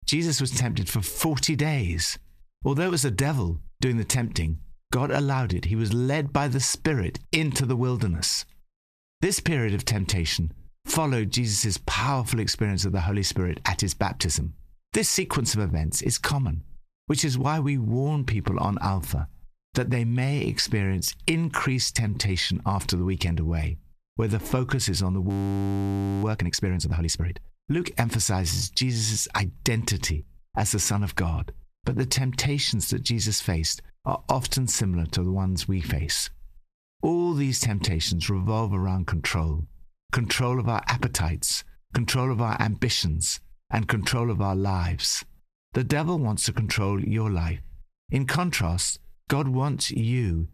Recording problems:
squashed, flat; heavily
audio freezing; at 25 s for 1 s

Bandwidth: 14.5 kHz